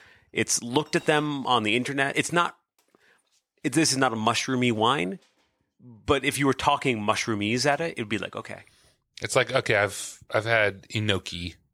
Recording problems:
household noises; faint; throughout; 30 dB below the speech

